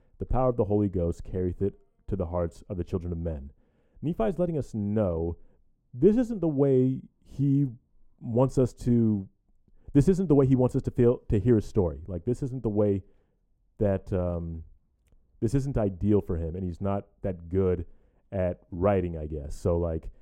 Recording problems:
muffled; very; fading above 1 kHz

